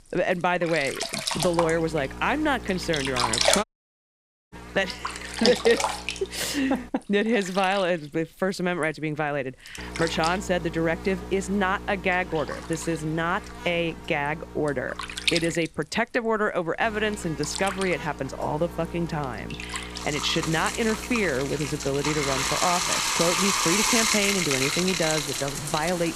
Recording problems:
household noises; loud; throughout; as loud as the speech
electrical hum; noticeable; from 1.5 to 7 s, from 10 to 16 s and from 17 to 23 s; 60 Hz, 15 dB below the speech
audio cutting out; at 3.5 s for 1 s

